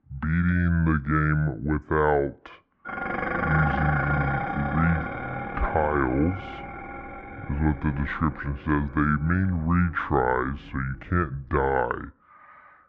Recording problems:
muffled; very; fading above 1.5 kHz
wrong speed and pitch; too slow and too low; 0.6 times normal speed
clattering dishes; loud; from 3 to 11 s; peak level with the speech

